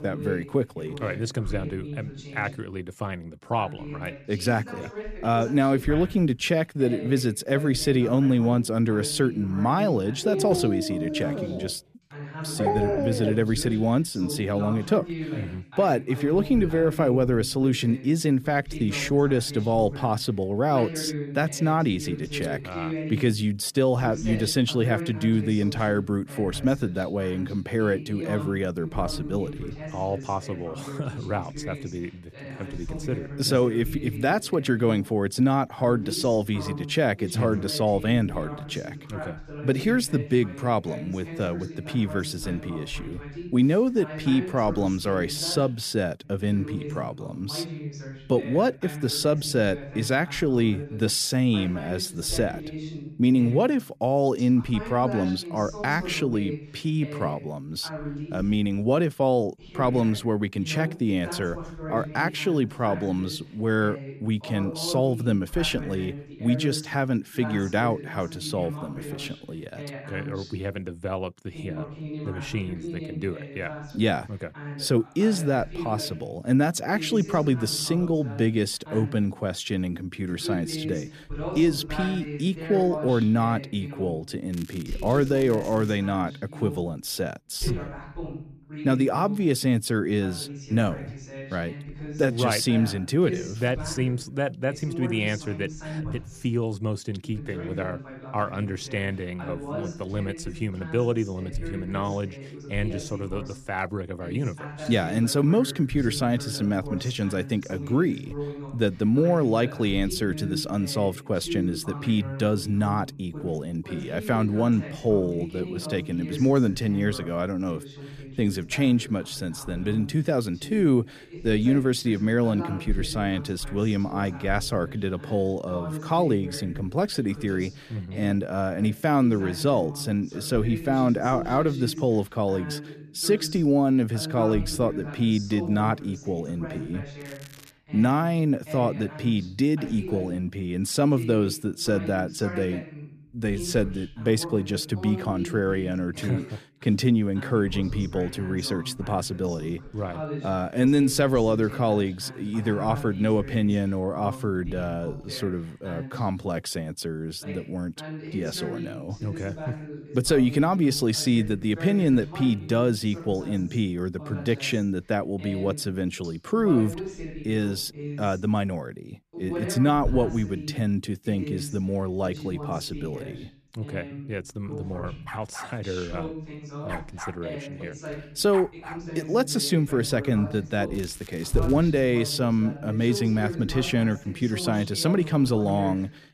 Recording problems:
voice in the background; noticeable; throughout; 10 dB below the speech
crackling; faint; from 1:25 to 1:26, at 2:17 and at 3:01; 25 dB below the speech
dog barking; loud; from 10 to 13 s; peak 1 dB above the speech
dog barking; faint; from 2:55 to 2:59; peak 10 dB below the speech

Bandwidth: 14.5 kHz